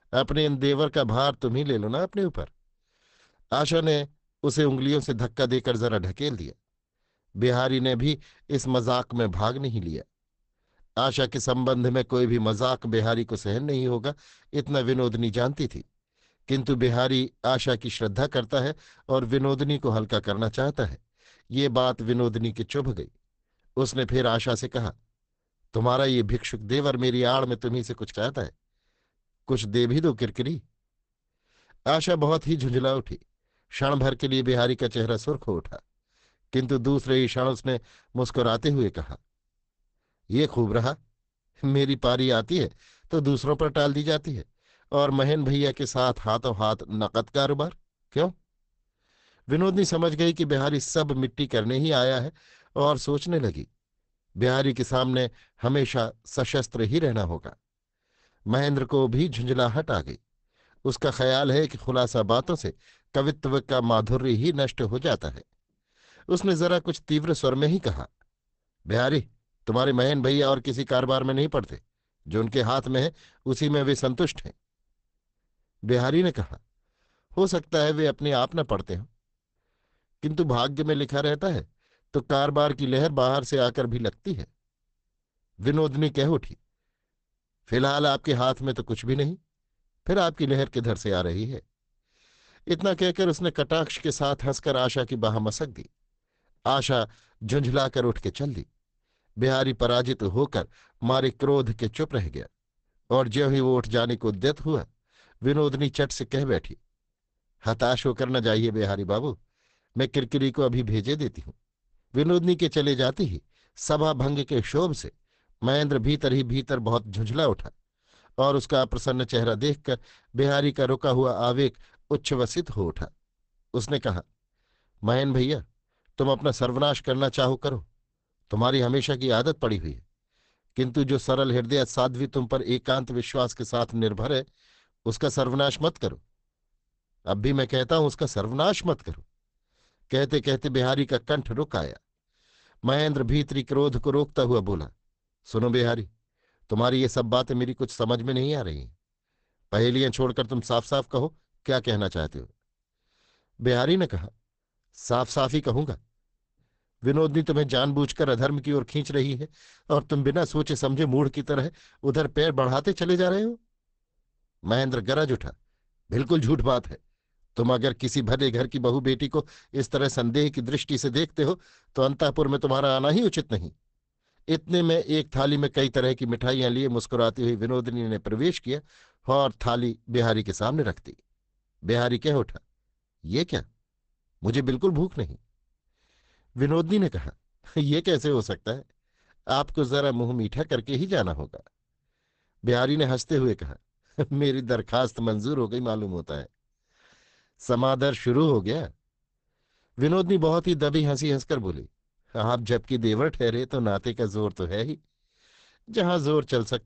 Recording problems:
garbled, watery; badly; nothing above 8 kHz

